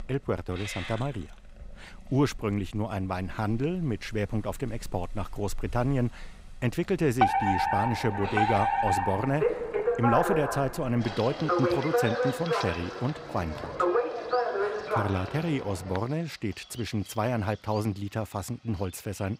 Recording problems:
animal sounds; noticeable; throughout; 15 dB below the speech
alarm; loud; from 7 to 16 s; peak 6 dB above the speech

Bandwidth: 15.5 kHz